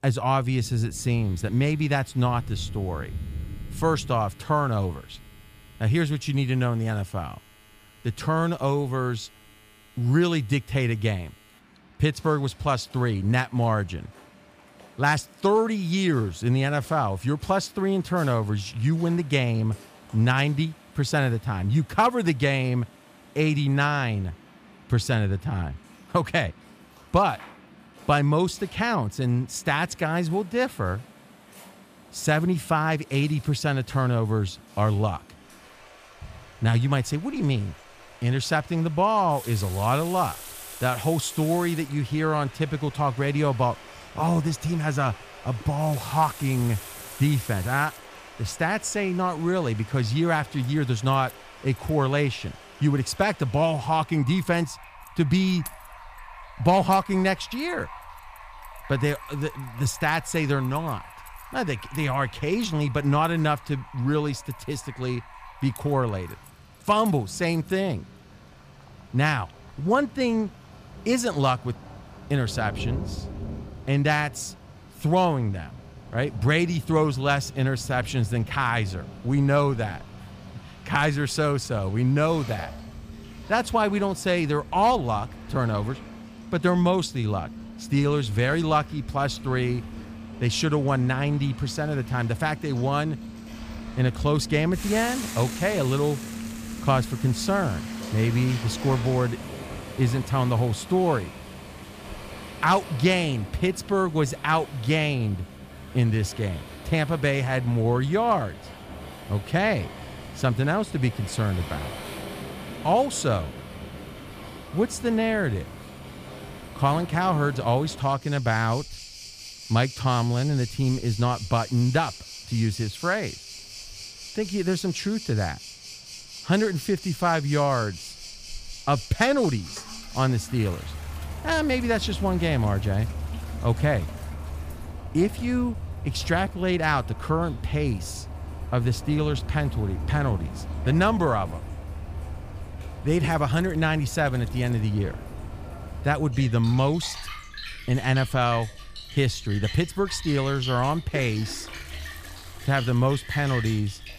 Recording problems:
rain or running water; noticeable; throughout; 15 dB below the speech
household noises; faint; throughout; 20 dB below the speech

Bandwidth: 15 kHz